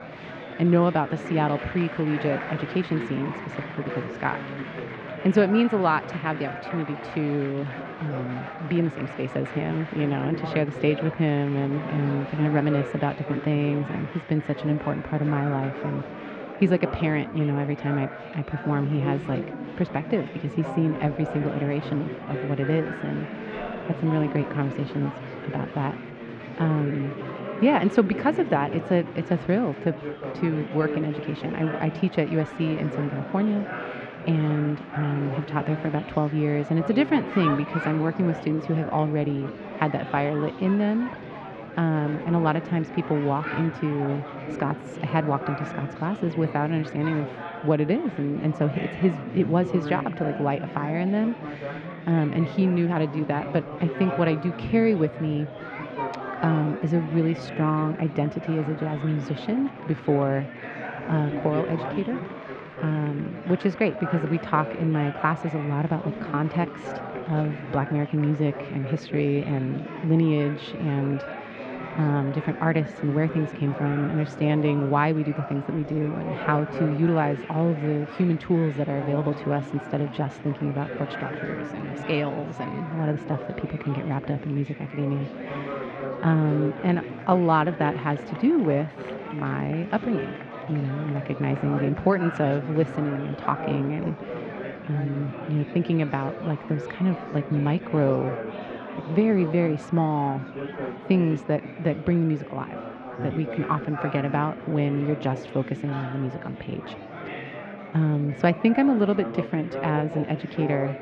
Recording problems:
muffled; very; fading above 3 kHz
murmuring crowd; loud; throughout; 9 dB below the speech

